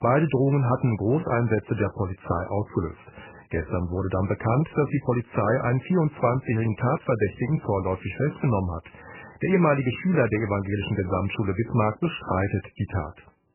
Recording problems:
garbled, watery; badly; nothing above 3 kHz

